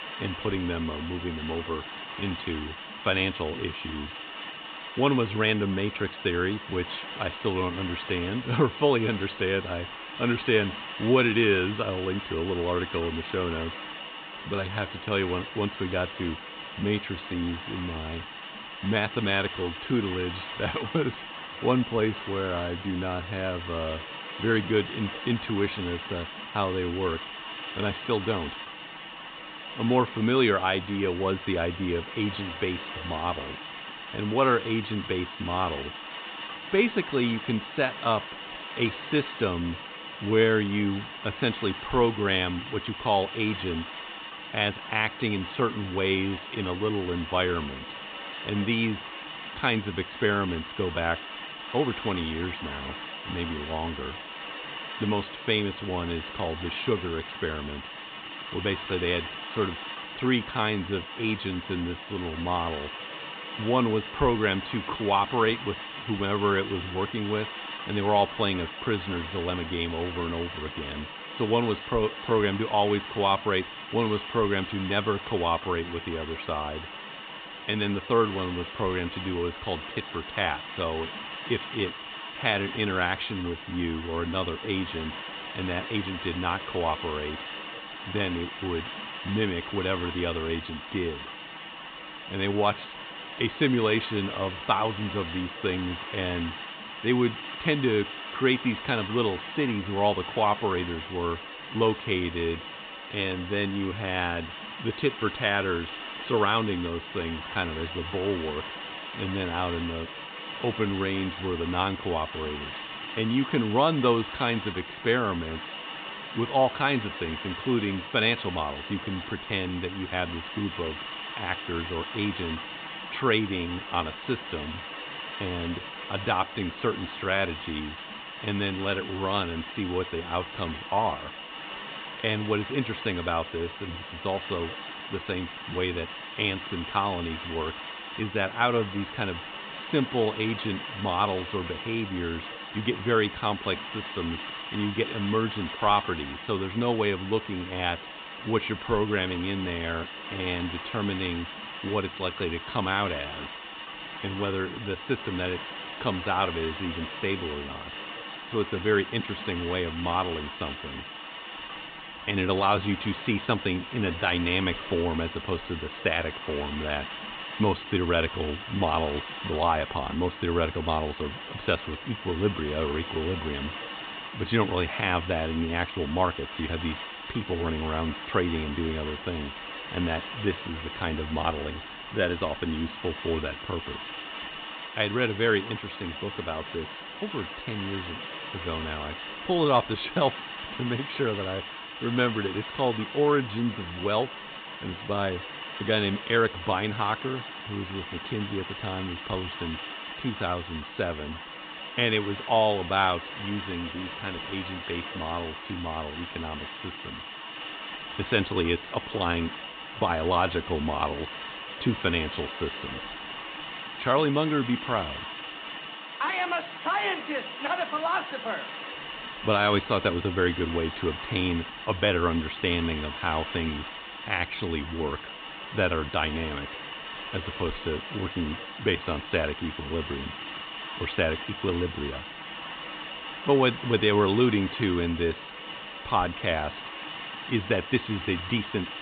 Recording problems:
high frequencies cut off; severe; nothing above 4 kHz
hiss; loud; throughout; 8 dB below the speech

